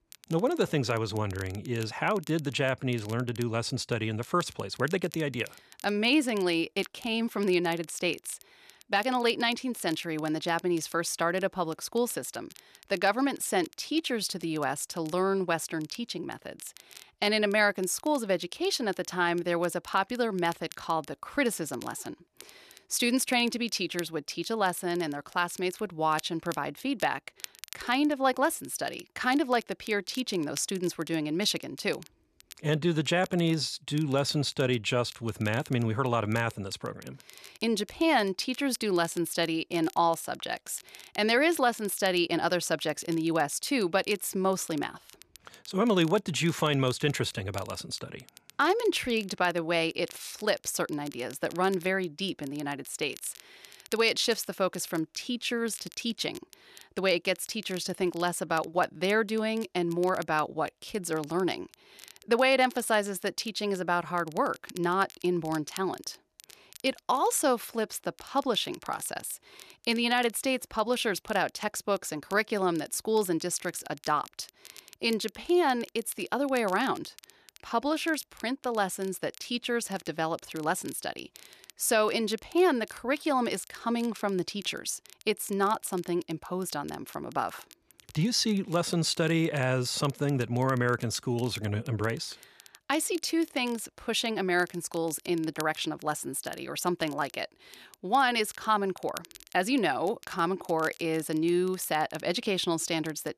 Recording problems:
crackle, like an old record; faint; 20 dB below the speech

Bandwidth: 13.5 kHz